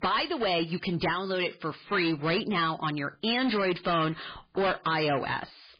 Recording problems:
distortion; heavy; 16% of the sound clipped
garbled, watery; badly; nothing above 4.5 kHz

